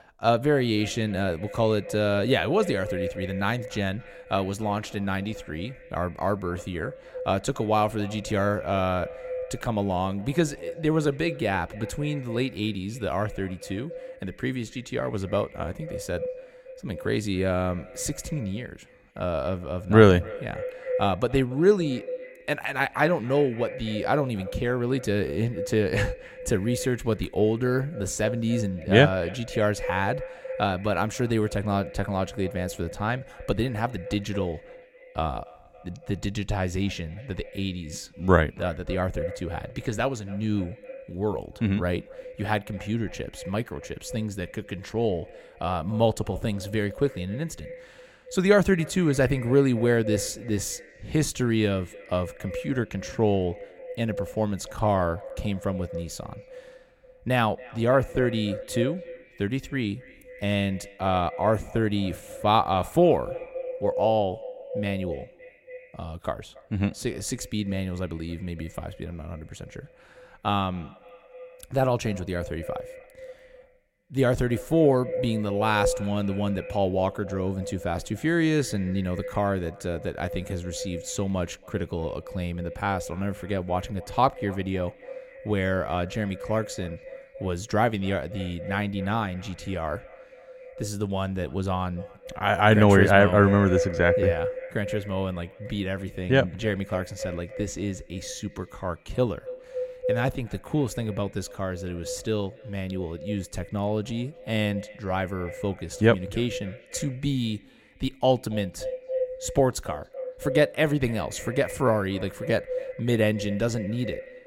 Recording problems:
echo of what is said; strong; throughout; 280 ms later, 10 dB below the speech

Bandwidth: 16 kHz